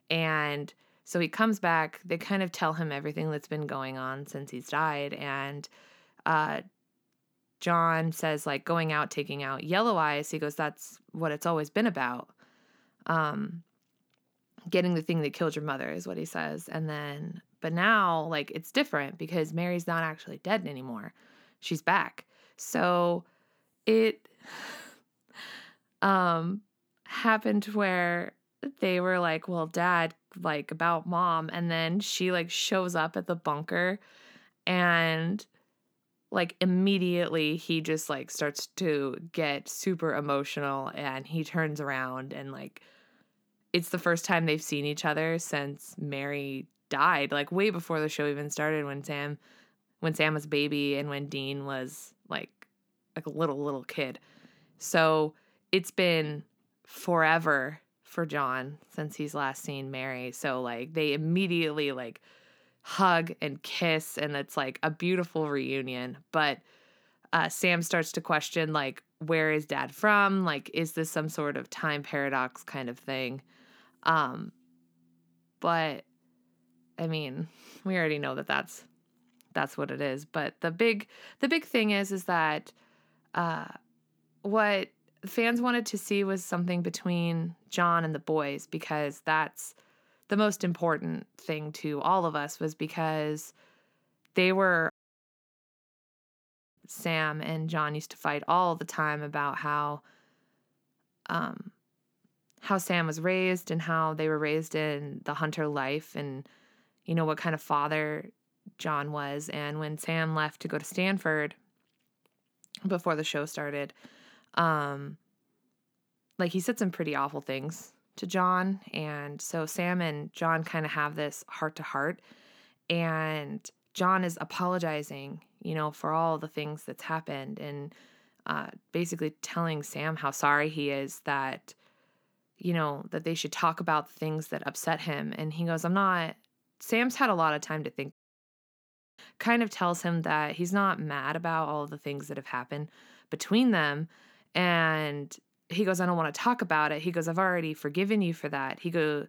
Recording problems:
audio cutting out; at 1:35 for 2 s and at 2:18 for 1 s

